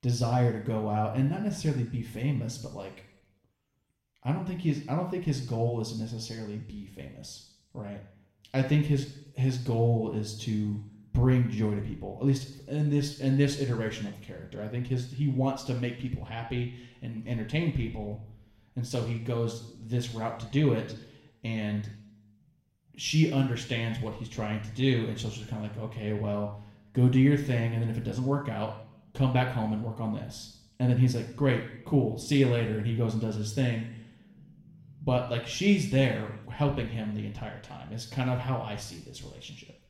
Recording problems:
room echo; slight; dies away in 0.7 s
off-mic speech; somewhat distant

